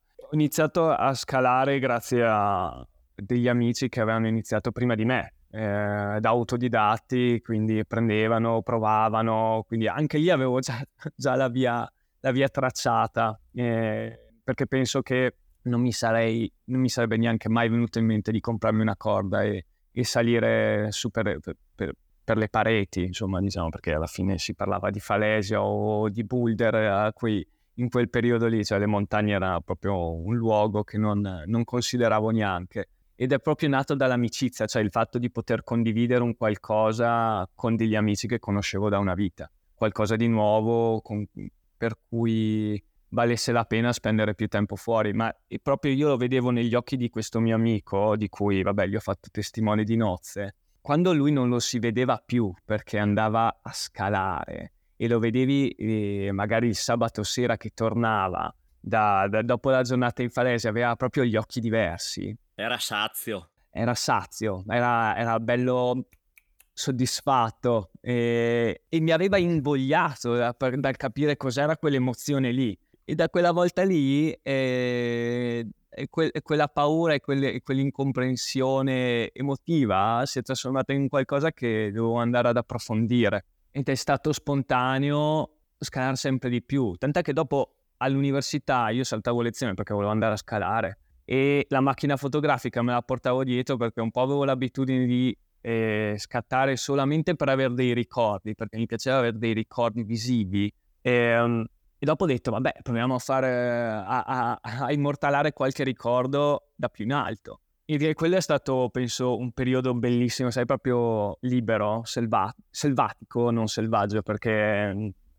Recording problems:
none

